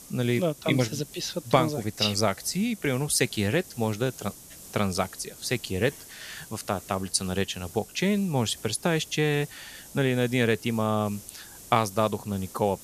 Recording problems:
hiss; noticeable; throughout; 15 dB below the speech

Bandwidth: 14.5 kHz